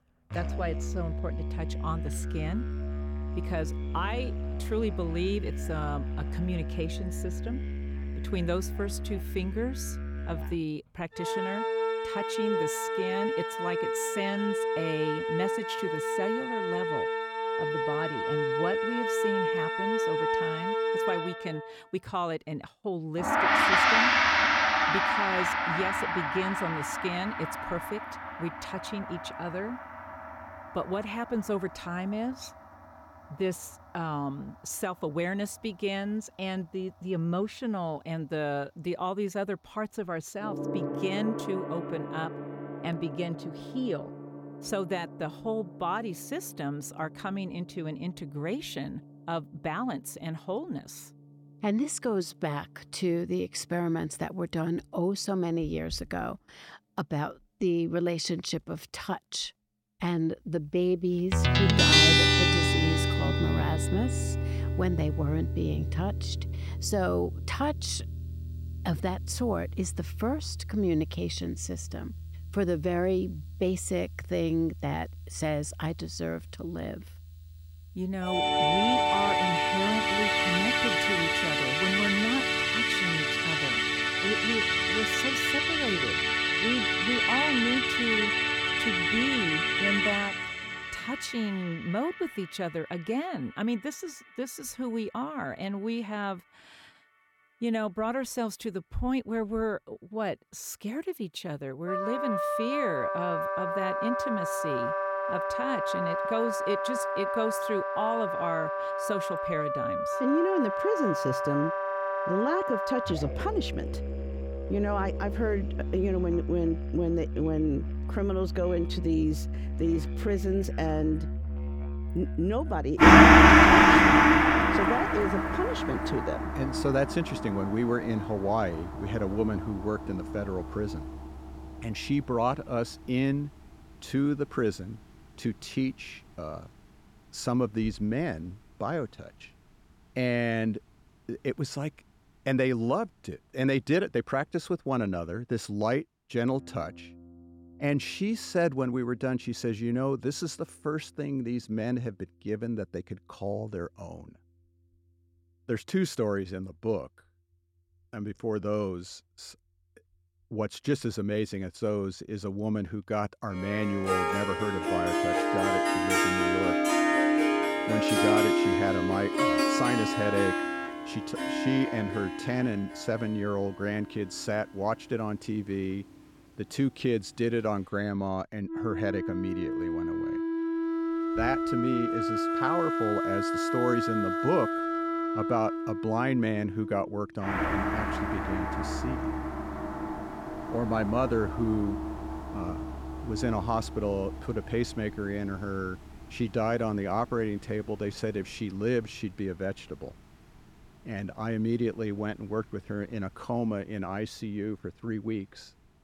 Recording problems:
background music; very loud; throughout; 5 dB above the speech

